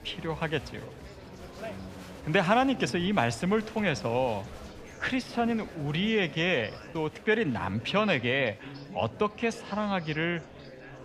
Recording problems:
murmuring crowd; noticeable; throughout; 15 dB below the speech

